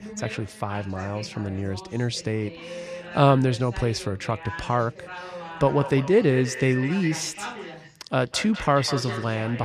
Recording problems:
echo of what is said; strong; from 5.5 s on; 200 ms later, 10 dB below the speech
background chatter; noticeable; throughout; 2 voices, 15 dB below the speech
abrupt cut into speech; at the end

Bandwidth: 14.5 kHz